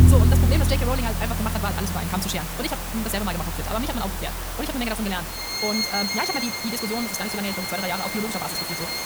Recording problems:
wrong speed, natural pitch; too fast; 1.6 times normal speed
background music; very loud; throughout; 2 dB above the speech
hiss; loud; throughout; 2 dB below the speech

